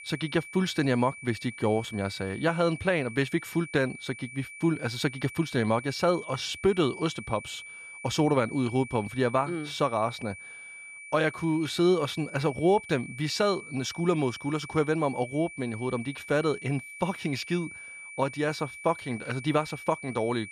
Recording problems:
high-pitched whine; noticeable; throughout; 2.5 kHz, 15 dB below the speech

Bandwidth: 14.5 kHz